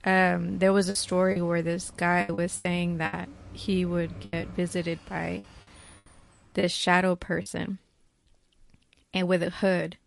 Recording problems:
garbled, watery; slightly; nothing above 11 kHz
traffic noise; faint; until 6 s; 20 dB below the speech
choppy; very; from 1 to 3 s and from 4.5 to 7.5 s; 12% of the speech affected

